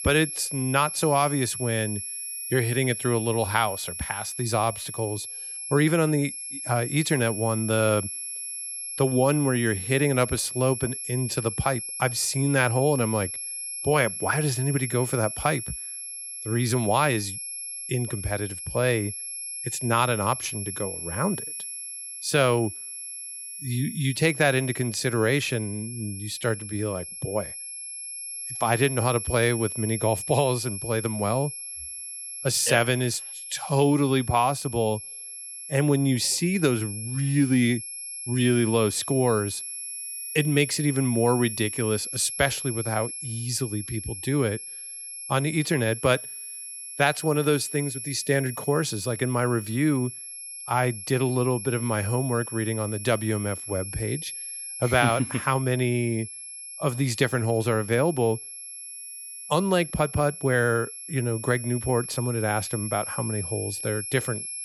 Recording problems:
high-pitched whine; loud; throughout; 11 kHz, 7 dB below the speech

